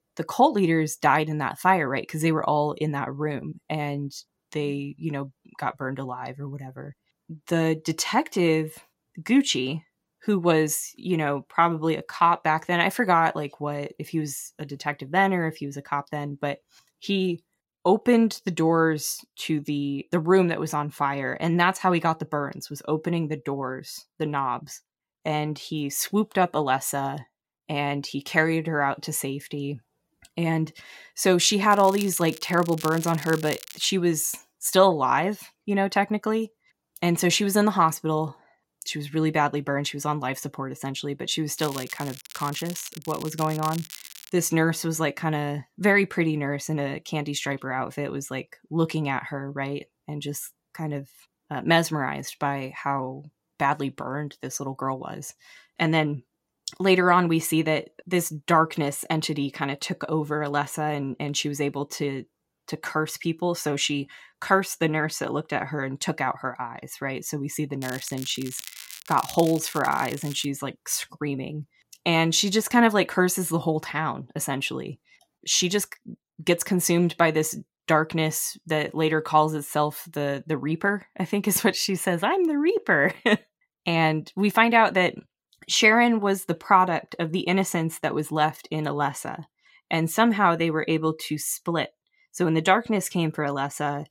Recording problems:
crackling; noticeable; from 32 to 34 s, from 42 to 44 s and from 1:08 to 1:10; 15 dB below the speech

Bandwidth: 16.5 kHz